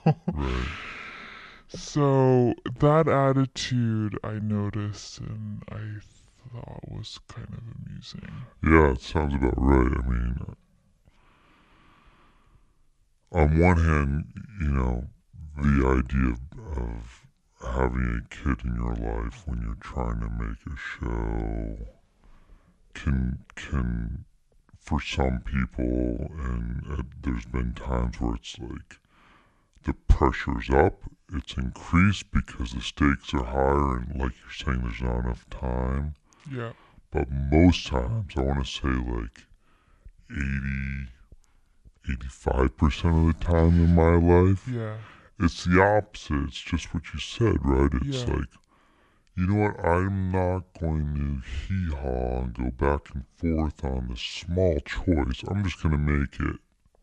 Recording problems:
wrong speed and pitch; too slow and too low; 0.7 times normal speed

